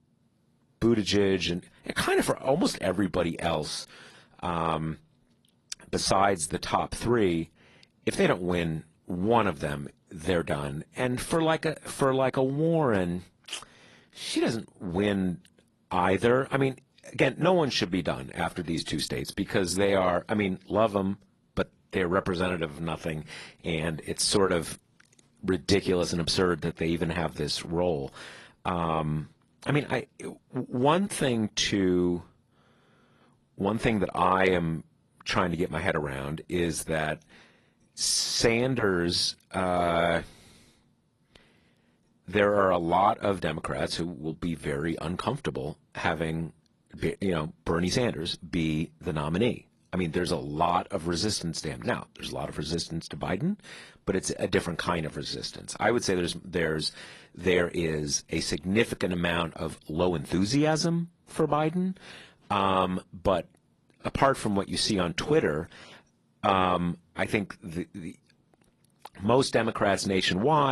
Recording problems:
garbled, watery; slightly; nothing above 11.5 kHz
abrupt cut into speech; at the end

